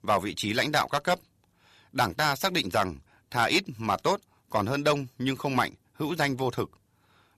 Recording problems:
distortion; slight; 1.4% of the sound clipped

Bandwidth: 14 kHz